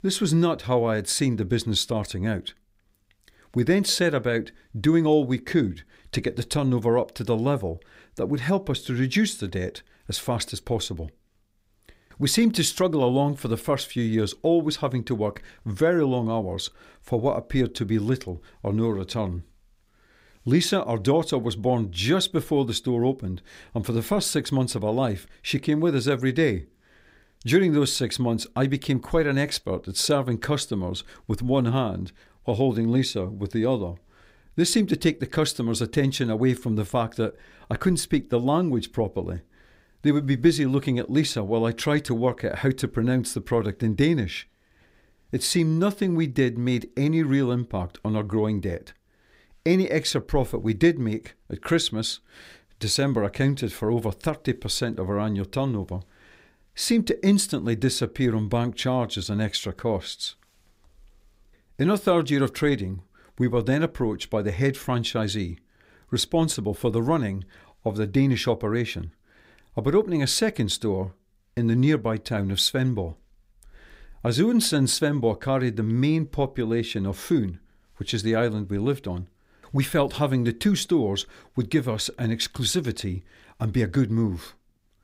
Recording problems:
none

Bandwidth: 15.5 kHz